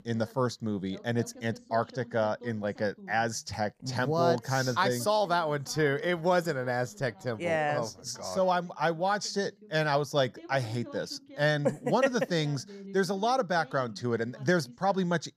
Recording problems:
voice in the background; faint; throughout; 20 dB below the speech

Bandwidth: 14.5 kHz